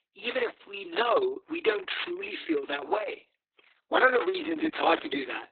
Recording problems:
garbled, watery; badly; nothing above 4 kHz
thin; very; fading below 300 Hz

